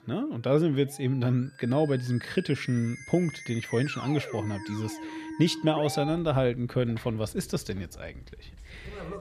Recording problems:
background music; noticeable; throughout; 15 dB below the speech

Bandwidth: 14 kHz